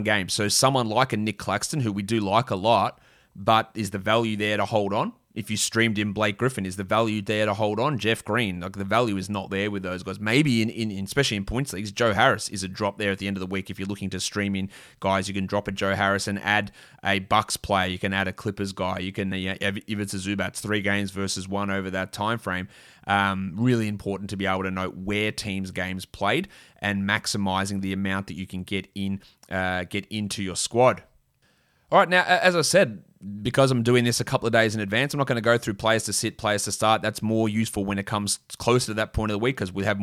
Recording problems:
abrupt cut into speech; at the start and the end

